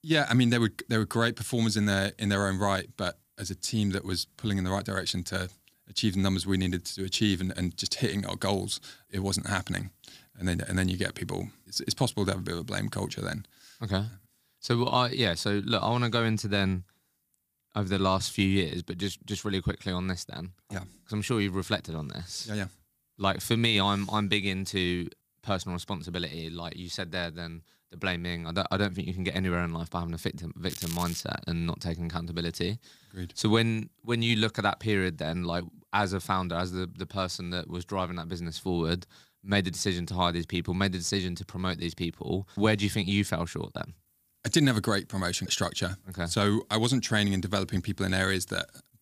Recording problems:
crackling; loud; at 31 s; 10 dB below the speech

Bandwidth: 15 kHz